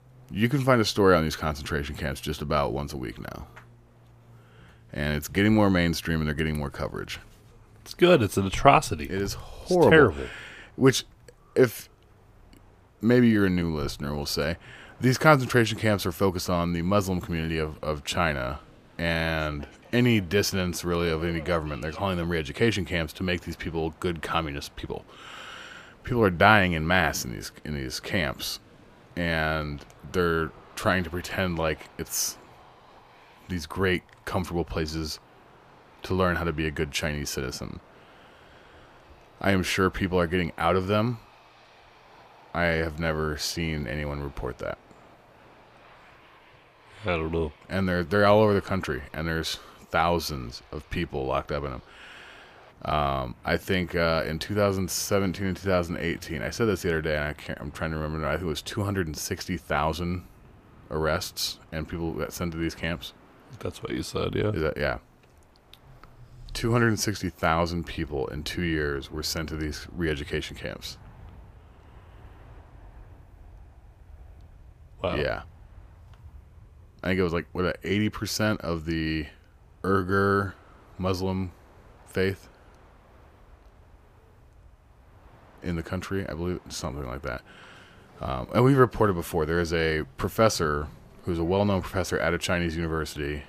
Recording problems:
train or aircraft noise; faint; throughout; 25 dB below the speech

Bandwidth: 15 kHz